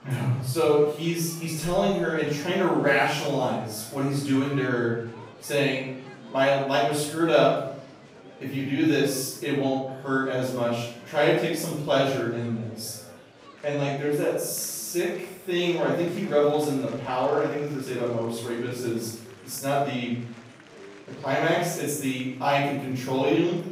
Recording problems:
room echo; strong; dies away in 0.7 s
off-mic speech; far
murmuring crowd; faint; throughout; 20 dB below the speech

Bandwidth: 15.5 kHz